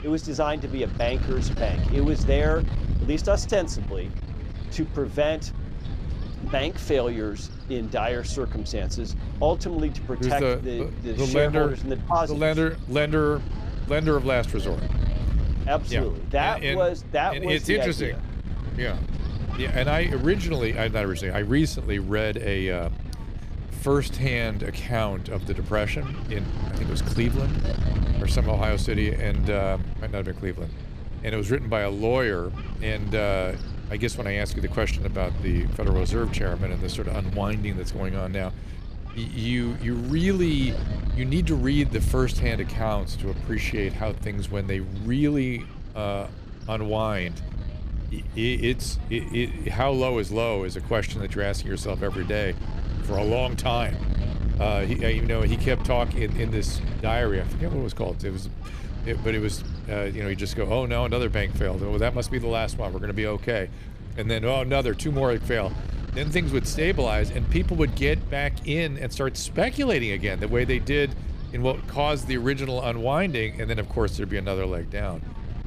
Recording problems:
wind noise on the microphone; occasional gusts; 15 dB below the speech

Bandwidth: 14.5 kHz